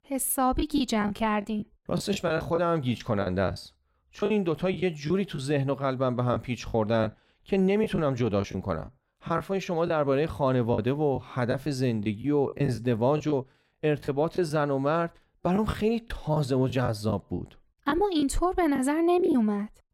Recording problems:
choppy; very; 8% of the speech affected

